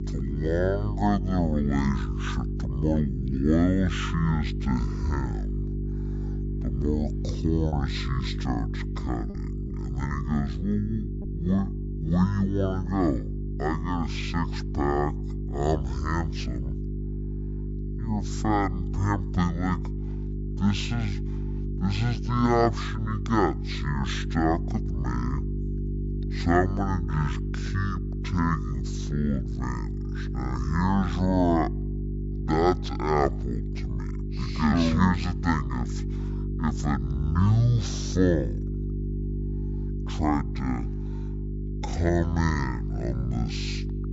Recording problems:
wrong speed and pitch; too slow and too low; 0.5 times normal speed
electrical hum; noticeable; throughout; 50 Hz, 10 dB below the speech
choppy; occasionally; from 7.5 to 12 s; 4% of the speech affected

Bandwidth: 7.5 kHz